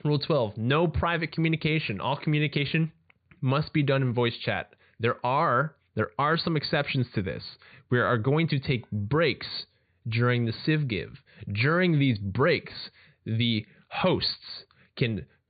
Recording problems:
high frequencies cut off; severe; nothing above 4.5 kHz

